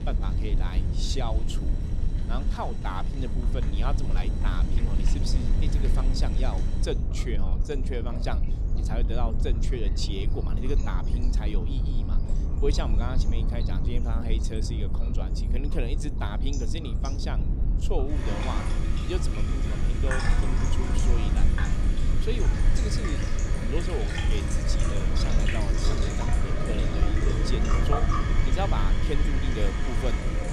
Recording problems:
household noises; very loud; throughout; 1 dB above the speech
low rumble; loud; throughout; 6 dB below the speech

